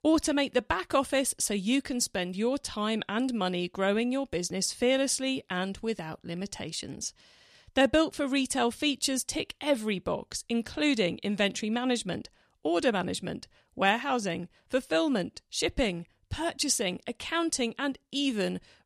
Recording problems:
none

